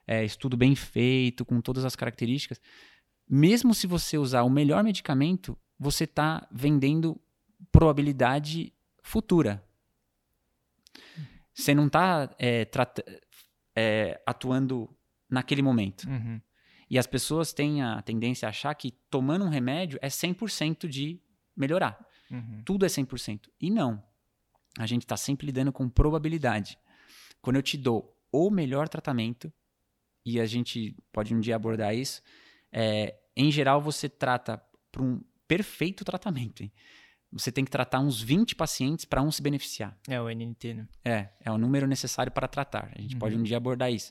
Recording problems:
none

